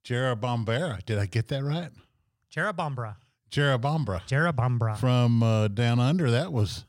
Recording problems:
none

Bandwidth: 16 kHz